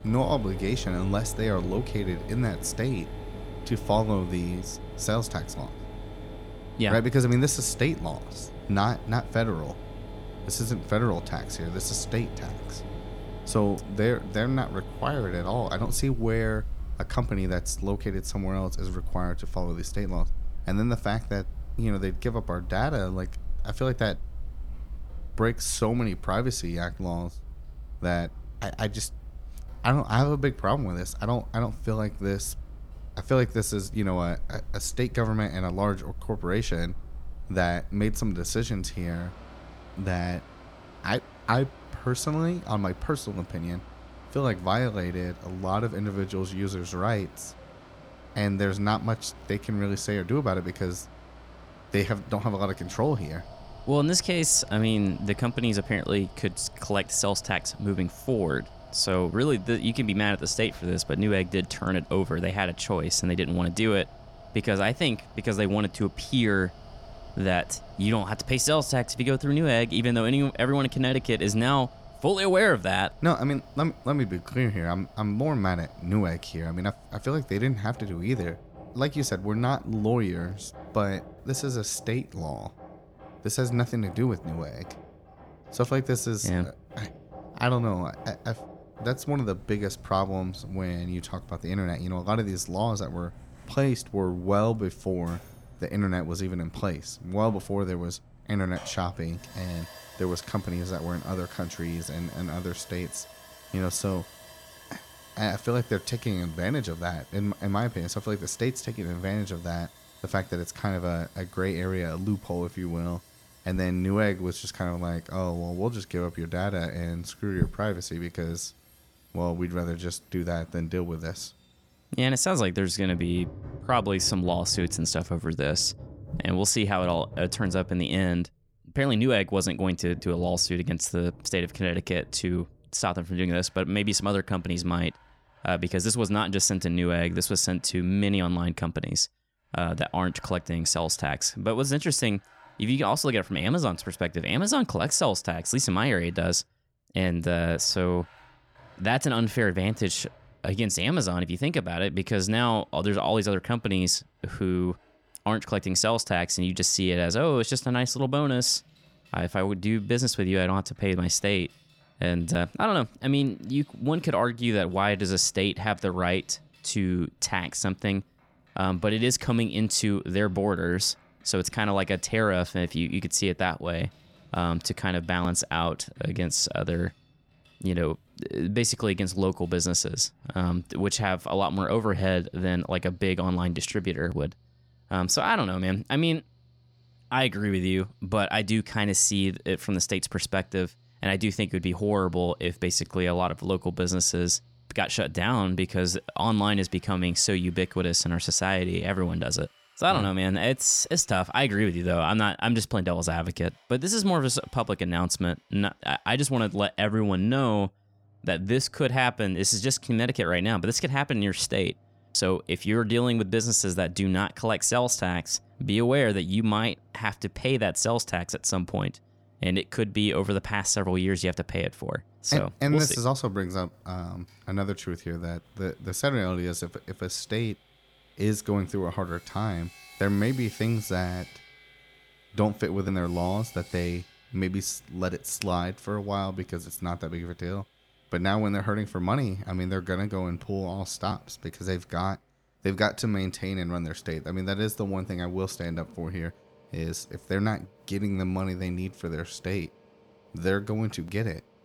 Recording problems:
machinery noise; noticeable; throughout; 15 dB below the speech

